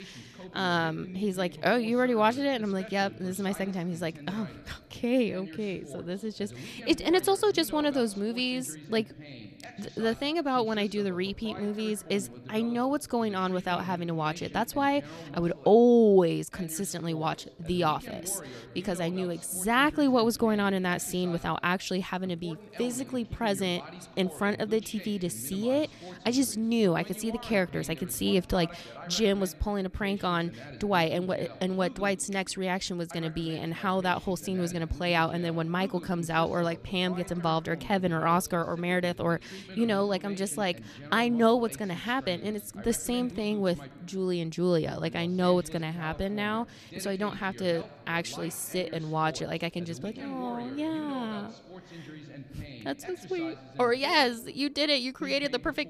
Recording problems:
voice in the background; noticeable; throughout; 15 dB below the speech

